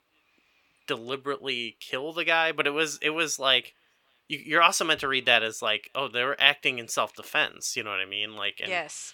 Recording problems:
thin; somewhat; fading below 700 Hz

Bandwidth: 17 kHz